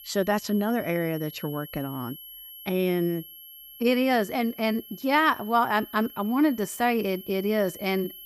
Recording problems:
high-pitched whine; noticeable; throughout; 11.5 kHz, 15 dB below the speech

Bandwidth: 15 kHz